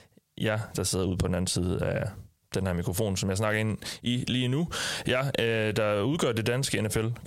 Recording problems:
squashed, flat; heavily

